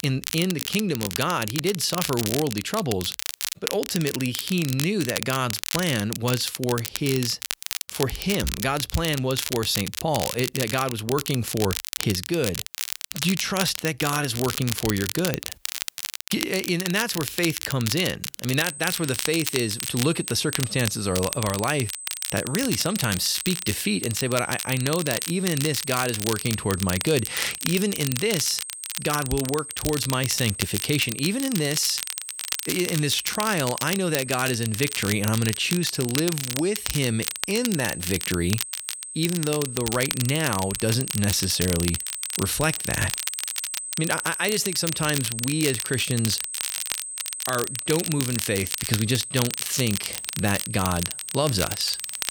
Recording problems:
high-pitched whine; loud; from 19 s on; 8 kHz, 8 dB below the speech
crackle, like an old record; loud; 5 dB below the speech

